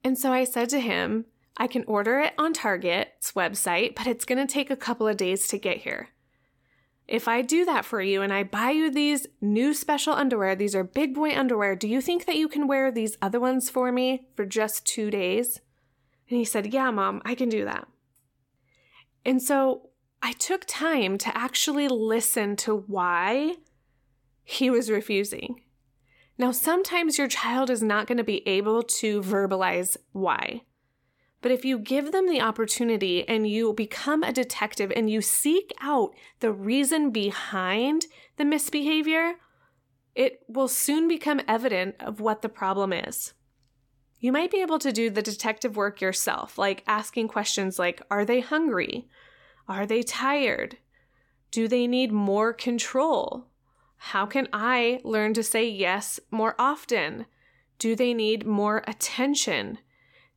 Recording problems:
none

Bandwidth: 17.5 kHz